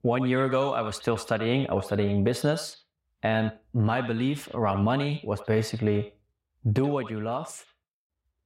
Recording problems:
echo of what is said; noticeable; throughout; 80 ms later, 15 dB below the speech

